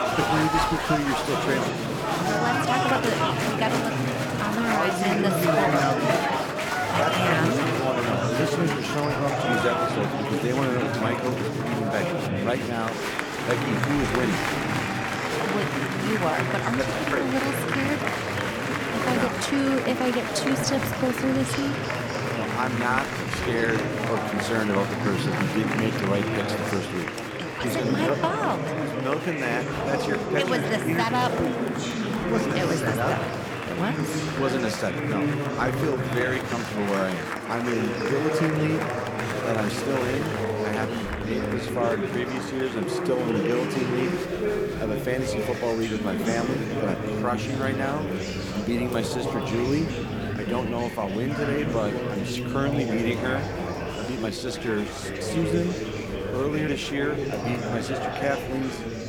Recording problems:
murmuring crowd; very loud; throughout; 1 dB above the speech

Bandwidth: 18 kHz